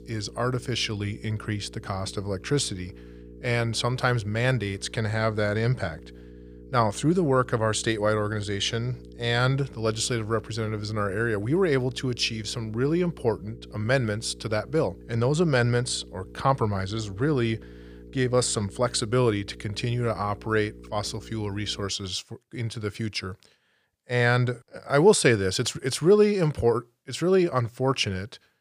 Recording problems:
electrical hum; faint; until 22 s; 60 Hz, 25 dB below the speech

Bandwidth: 15 kHz